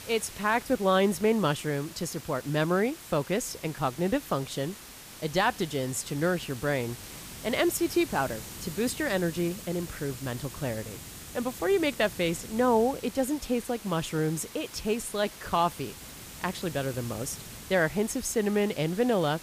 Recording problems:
hiss; noticeable; throughout; 15 dB below the speech

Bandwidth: 15 kHz